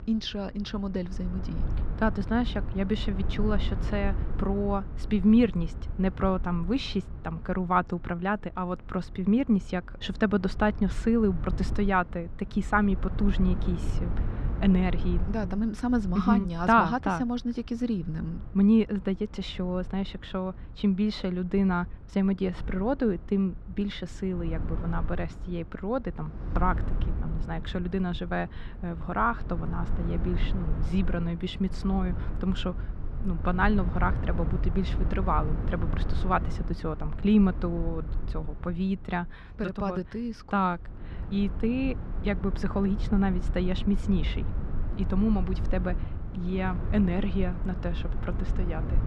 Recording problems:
muffled; slightly; fading above 4 kHz
wind noise on the microphone; occasional gusts; 15 dB below the speech

